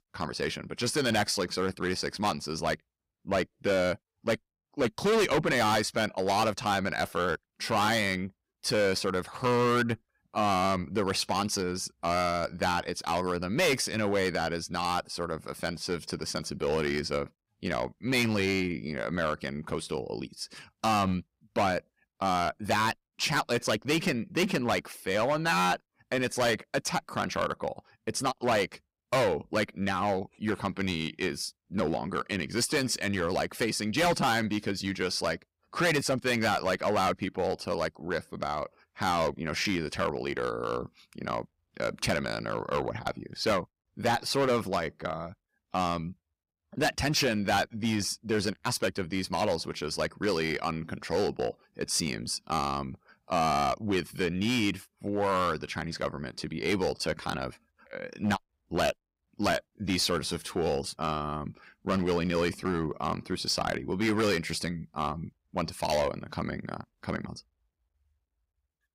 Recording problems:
distortion; heavy; 7% of the sound clipped

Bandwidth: 15.5 kHz